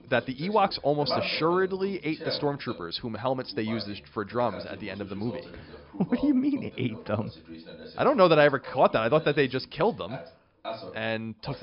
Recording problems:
high frequencies cut off; noticeable; nothing above 5.5 kHz
voice in the background; noticeable; throughout; 15 dB below the speech

